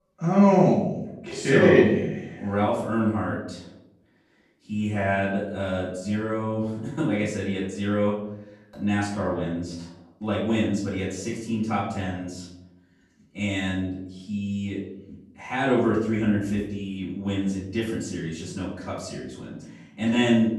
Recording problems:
off-mic speech; far
room echo; noticeable; dies away in 0.8 s

